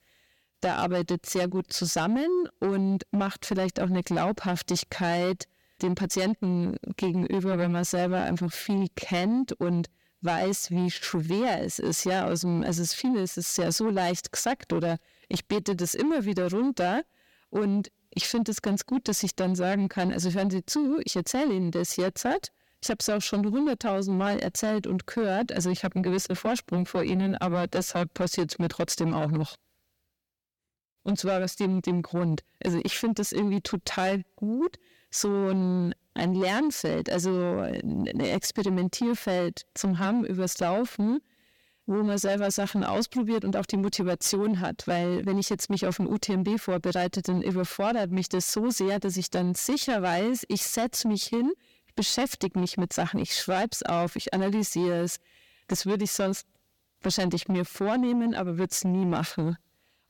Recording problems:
distortion; slight; 10 dB below the speech

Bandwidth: 17 kHz